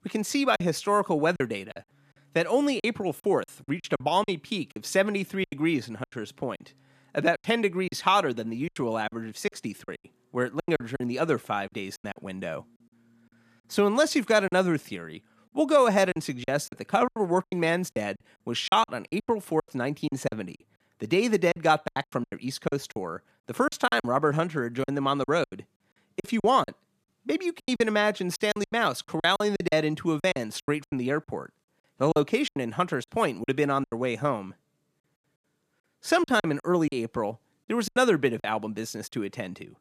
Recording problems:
choppy; very; 12% of the speech affected

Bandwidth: 14.5 kHz